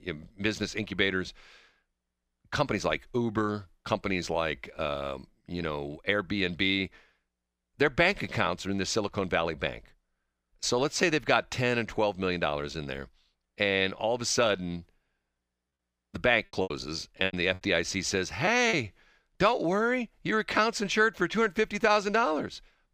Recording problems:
choppy; very; from 17 to 19 s; 10% of the speech affected

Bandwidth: 15 kHz